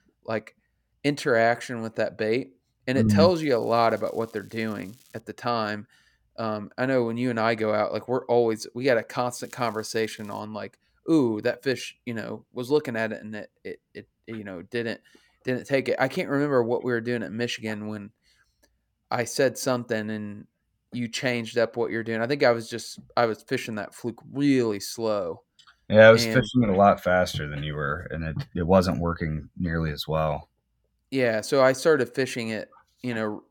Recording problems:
crackling; faint; from 3.5 to 5 s and at 9.5 s; 30 dB below the speech

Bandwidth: 18 kHz